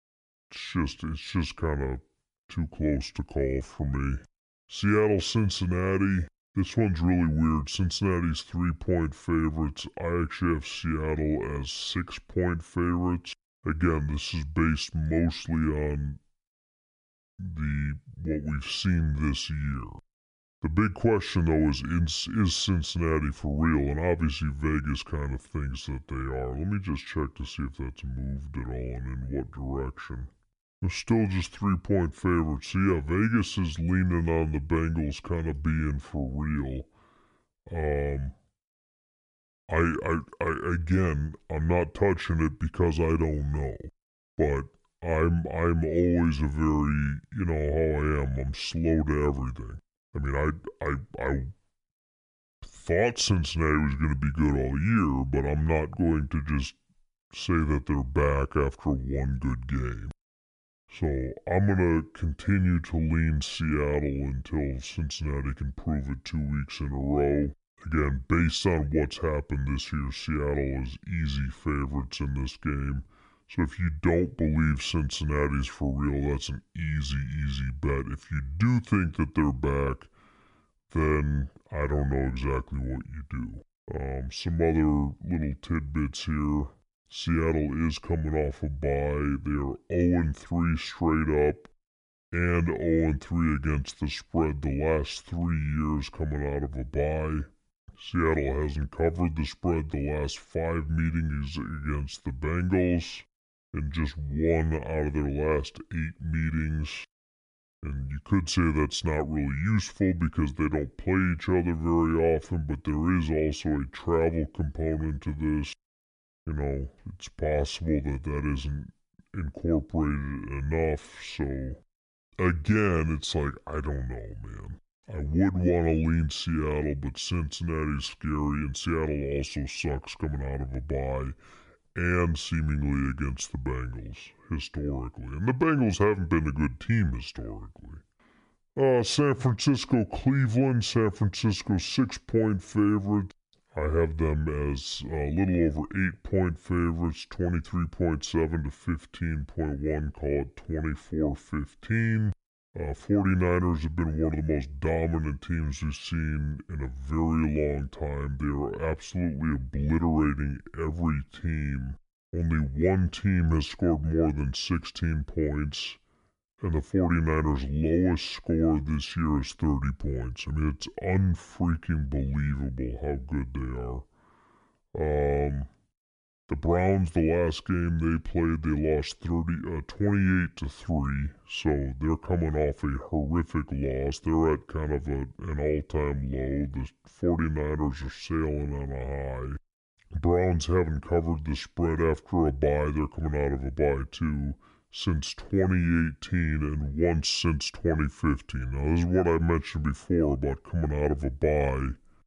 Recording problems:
wrong speed and pitch; too slow and too low; 0.7 times normal speed

